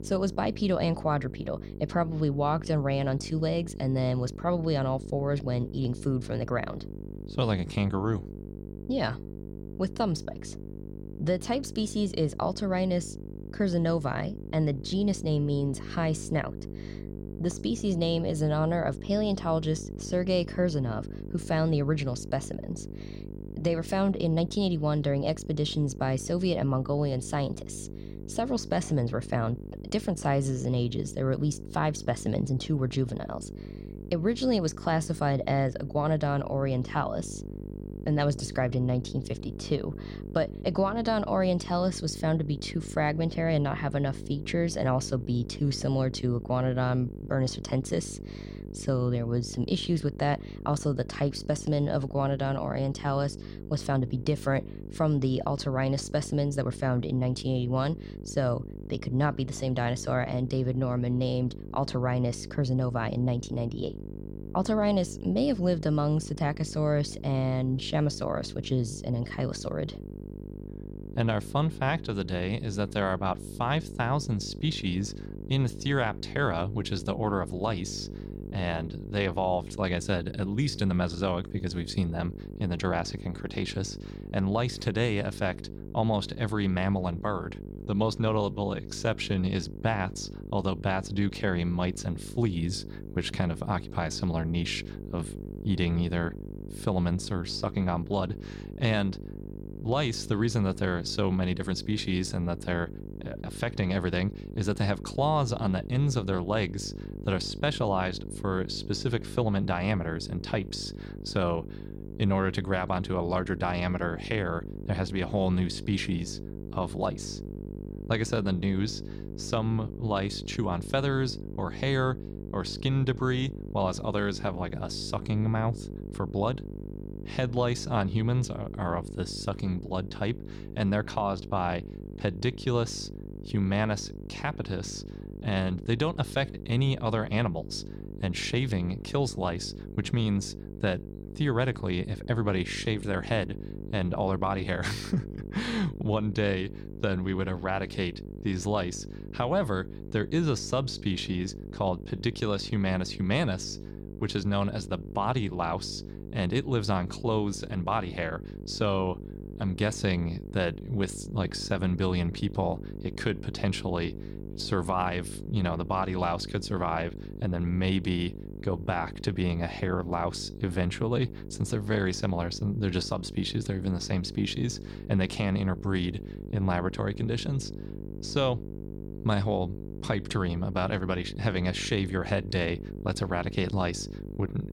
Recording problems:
electrical hum; noticeable; throughout; 50 Hz, 15 dB below the speech

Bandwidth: 16 kHz